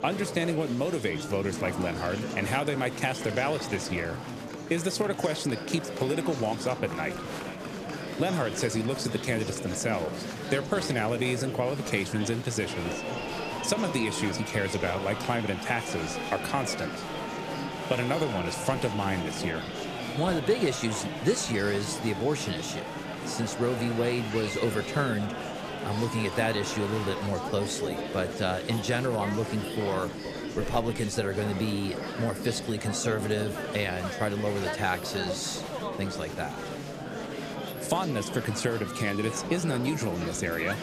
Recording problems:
murmuring crowd; loud; throughout; 5 dB below the speech

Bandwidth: 14.5 kHz